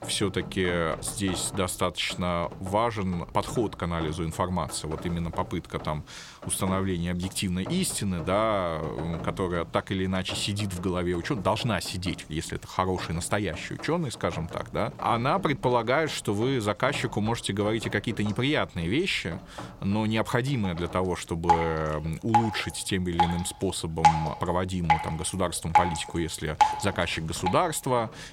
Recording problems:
rain or running water; loud; throughout; 4 dB below the speech

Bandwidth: 16.5 kHz